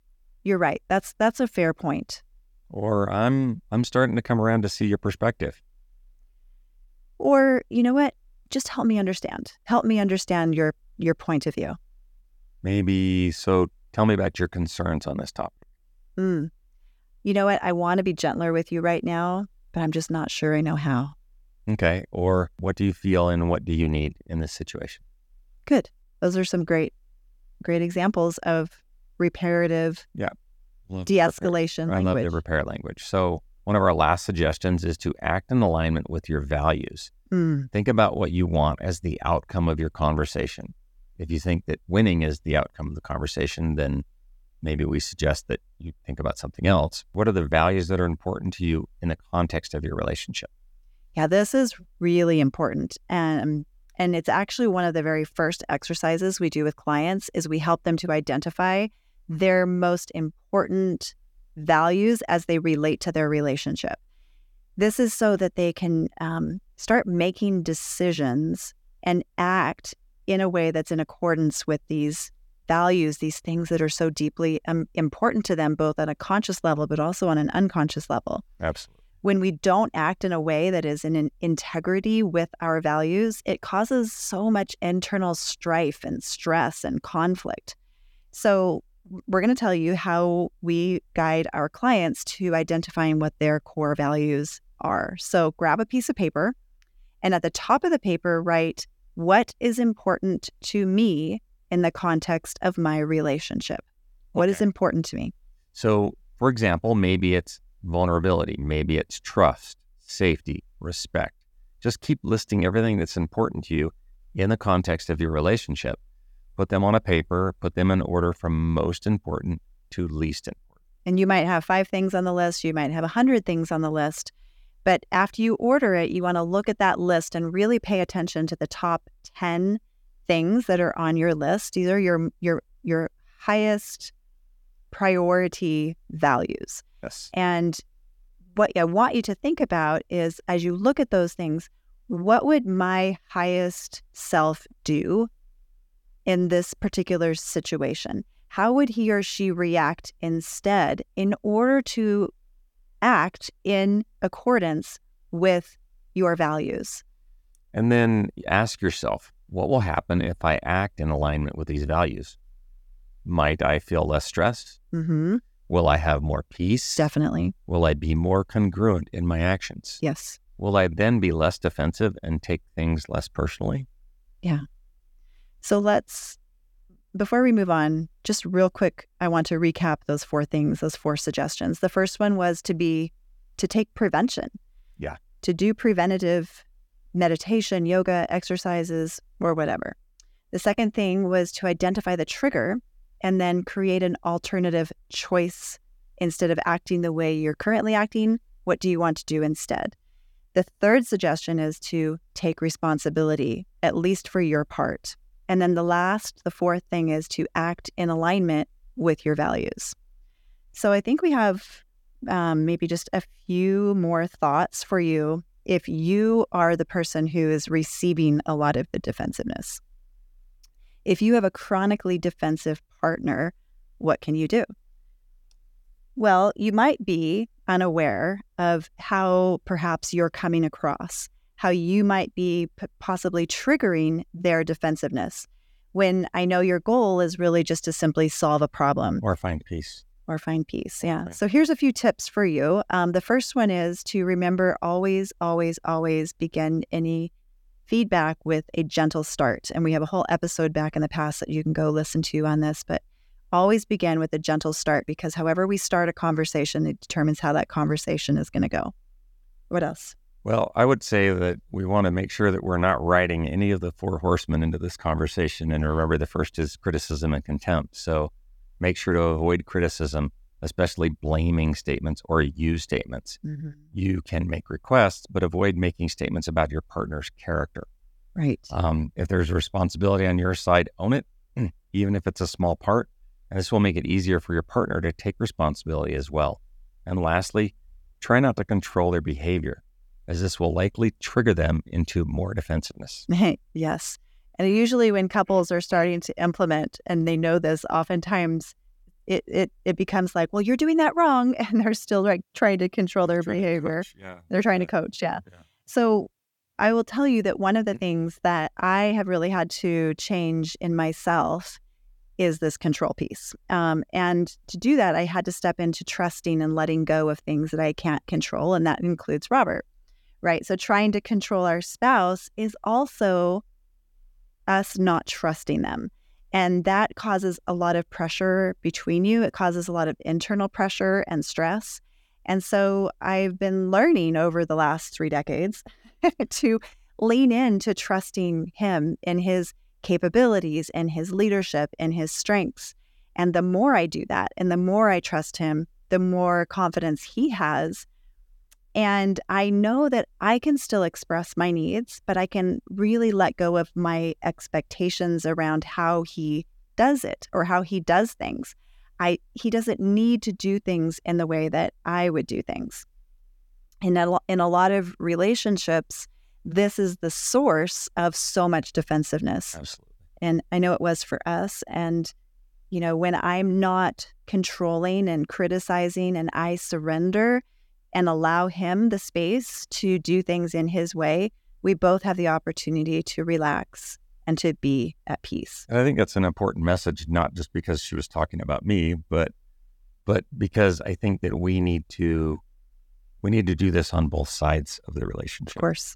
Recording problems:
none

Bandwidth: 17.5 kHz